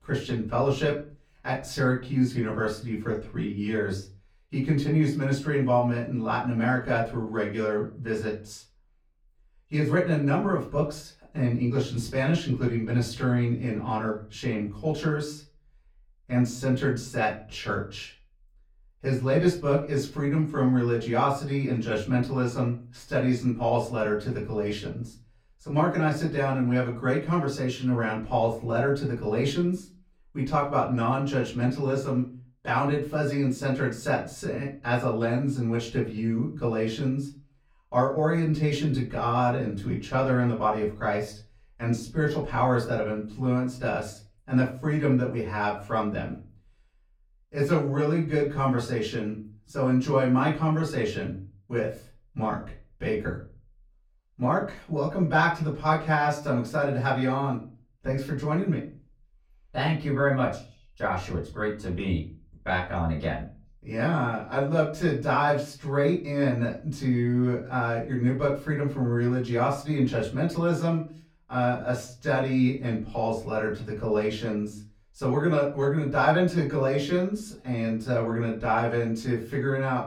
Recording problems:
off-mic speech; far
room echo; slight; dies away in 0.3 s

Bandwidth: 17.5 kHz